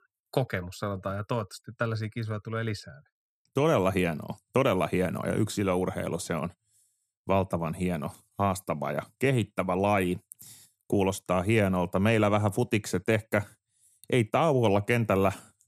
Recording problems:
none

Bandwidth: 14.5 kHz